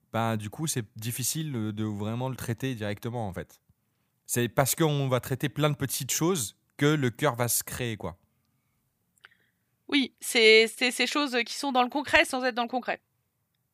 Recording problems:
none

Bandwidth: 15 kHz